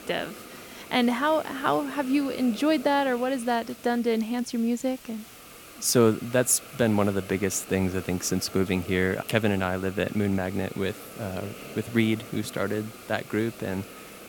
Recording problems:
hiss; noticeable; throughout; 15 dB below the speech

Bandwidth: 17 kHz